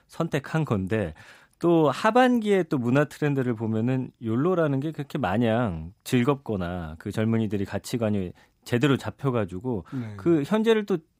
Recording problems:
none

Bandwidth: 15.5 kHz